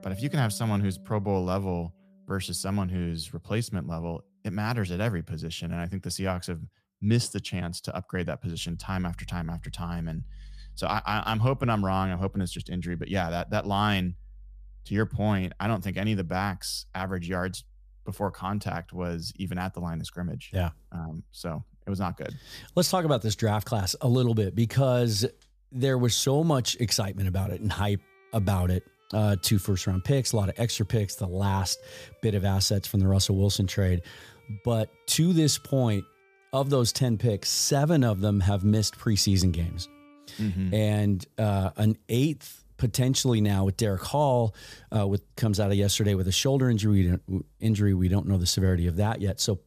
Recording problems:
background music; faint; throughout; 25 dB below the speech

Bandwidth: 14.5 kHz